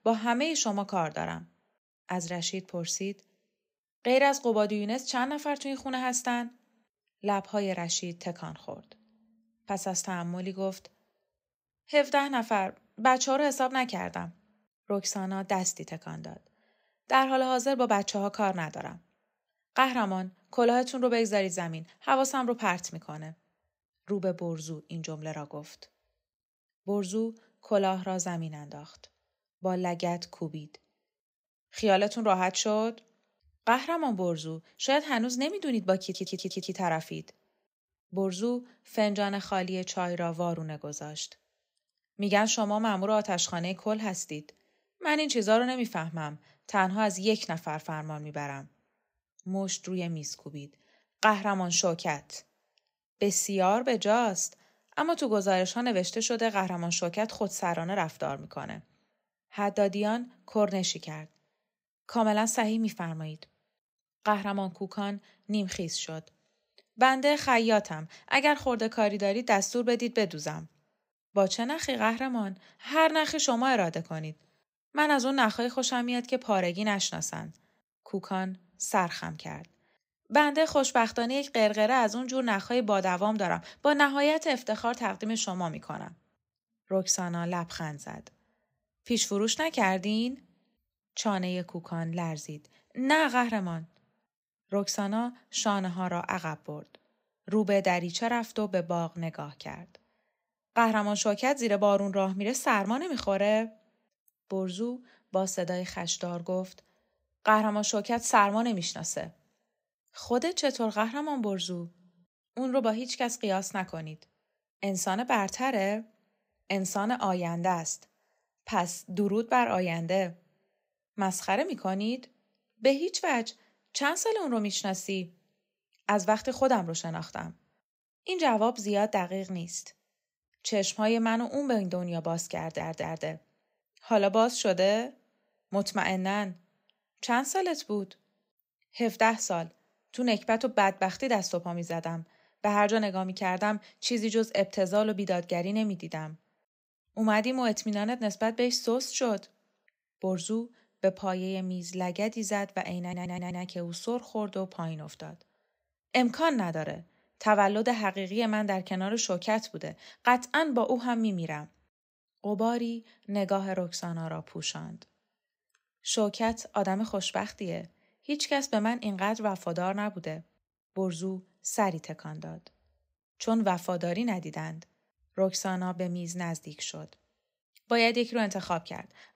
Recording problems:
audio stuttering; at 36 s, at 2:13 and at 2:33

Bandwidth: 15.5 kHz